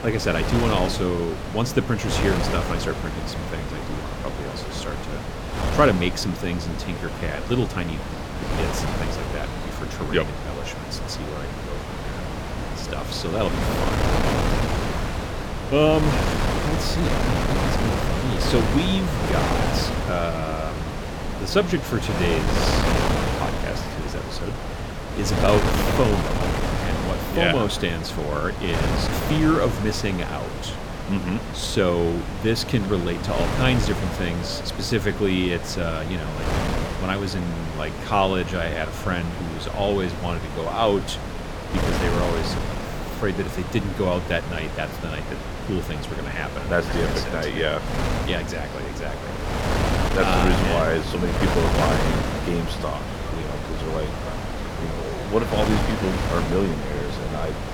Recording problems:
wind noise on the microphone; heavy; 2 dB below the speech
train or aircraft noise; noticeable; throughout; 20 dB below the speech

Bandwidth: 17.5 kHz